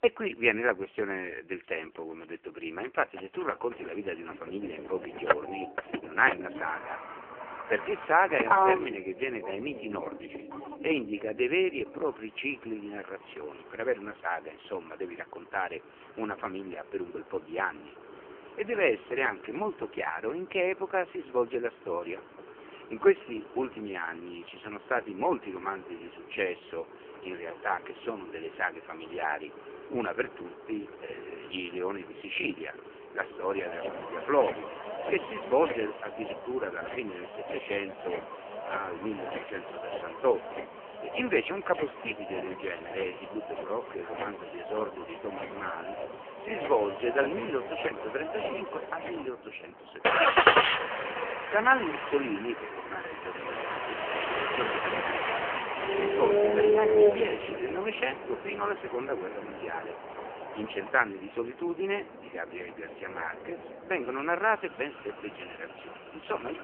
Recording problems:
phone-call audio; poor line
traffic noise; very loud; throughout; as loud as the speech

